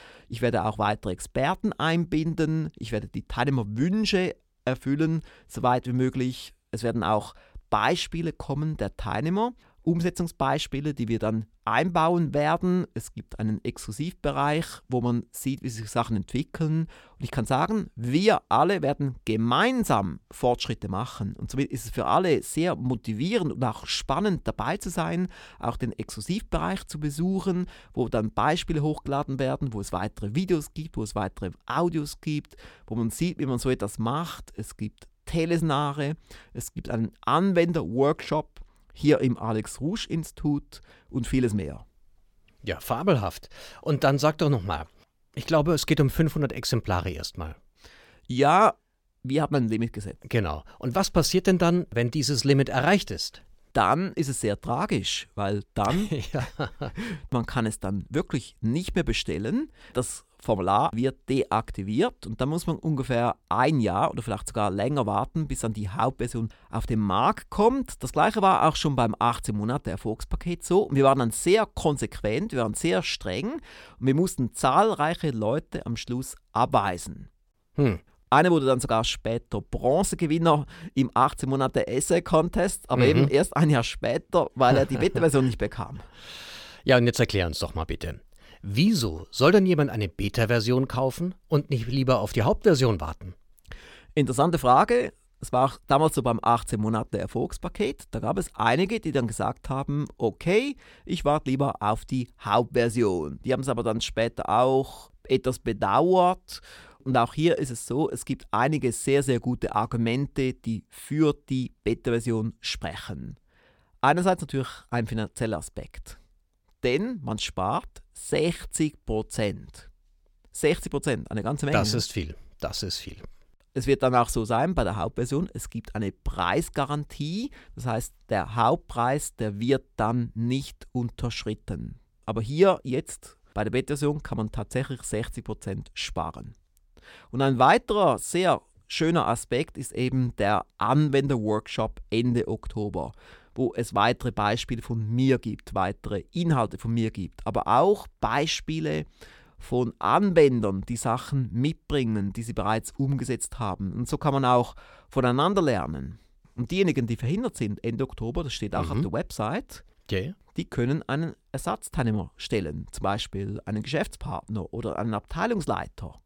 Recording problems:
none

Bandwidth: 17.5 kHz